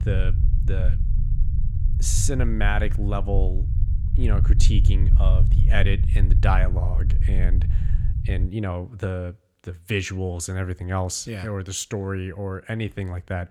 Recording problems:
low rumble; loud; until 8.5 s; 10 dB below the speech

